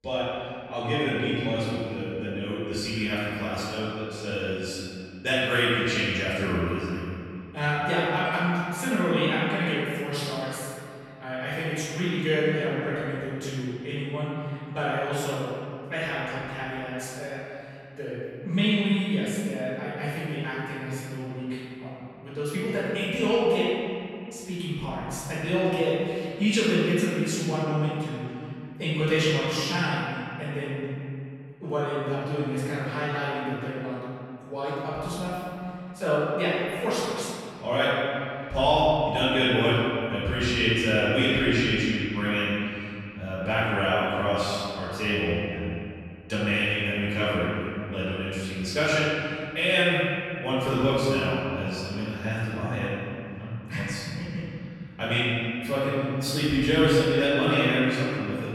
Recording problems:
room echo; strong; dies away in 2.5 s
off-mic speech; far

